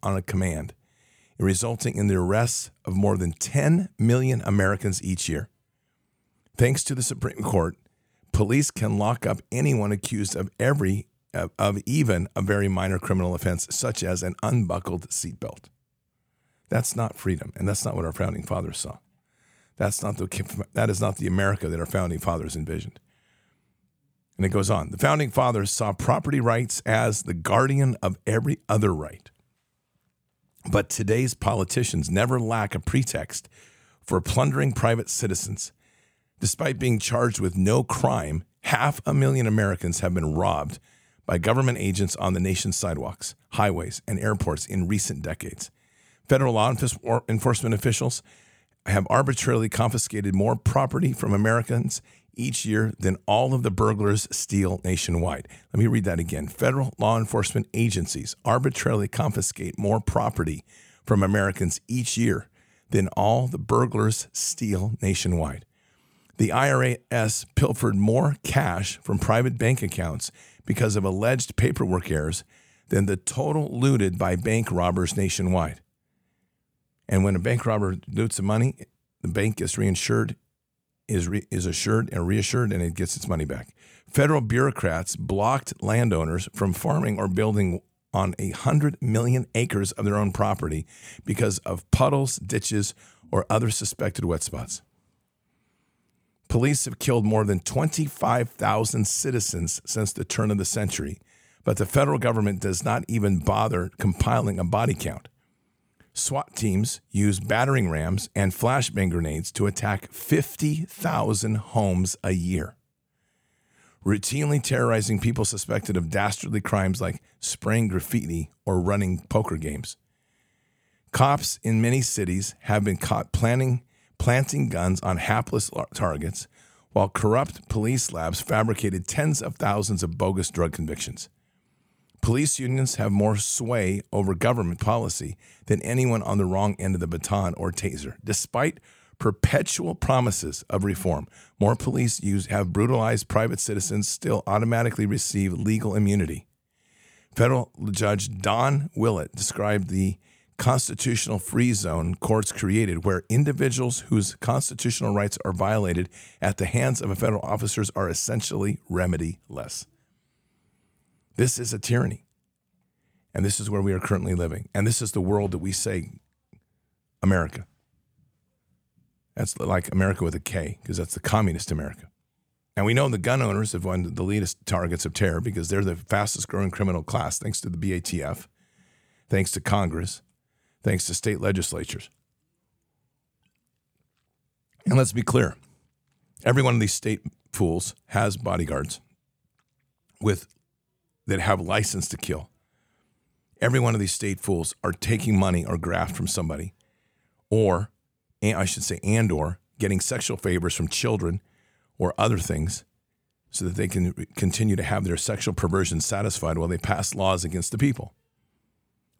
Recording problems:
none

